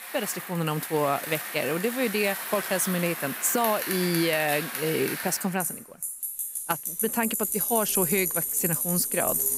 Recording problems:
traffic noise; loud; throughout; 2 dB below the speech

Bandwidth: 15.5 kHz